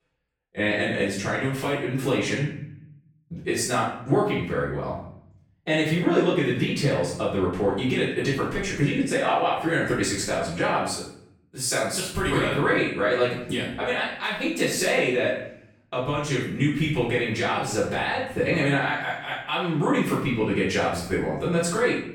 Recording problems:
off-mic speech; far
room echo; noticeable; dies away in 0.6 s

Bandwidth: 17.5 kHz